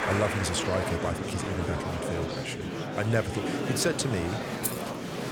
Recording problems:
murmuring crowd; loud; throughout; 1 dB below the speech
jangling keys; noticeable; at 4.5 s; peak 2 dB below the speech

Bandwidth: 18 kHz